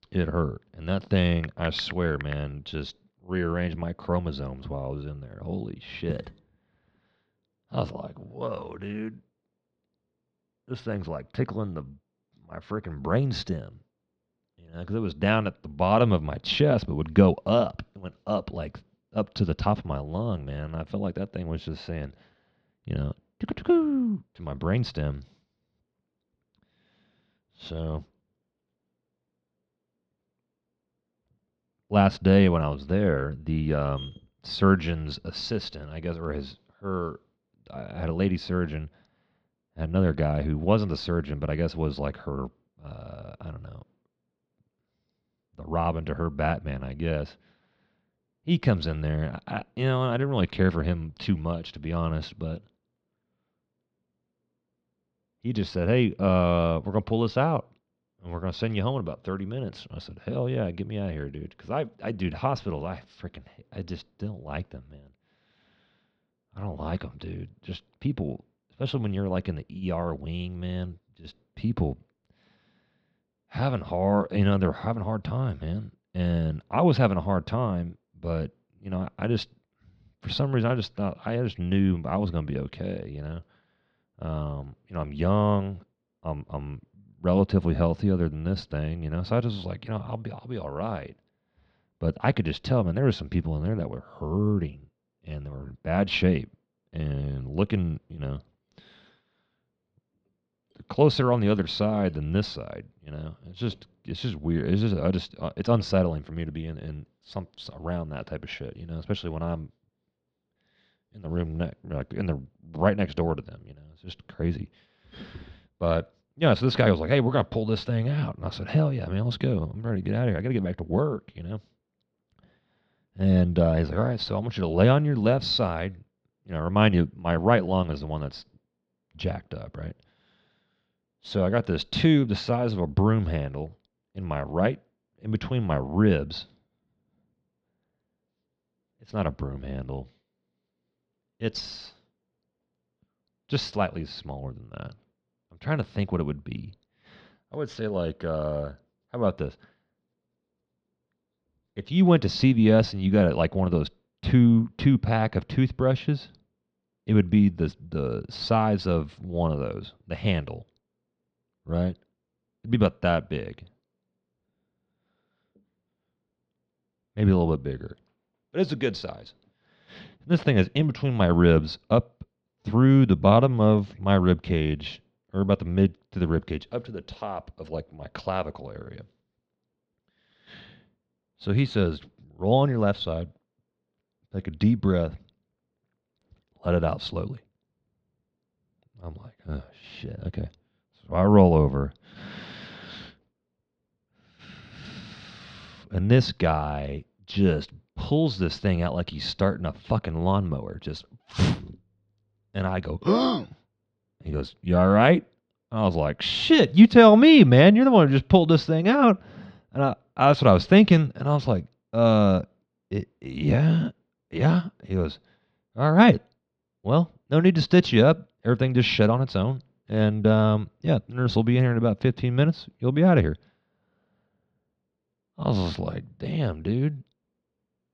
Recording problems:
muffled; slightly; fading above 4 kHz

